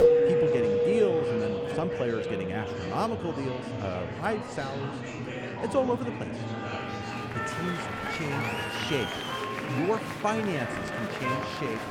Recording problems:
background music; very loud; throughout; 1 dB above the speech
murmuring crowd; loud; throughout; 2 dB below the speech

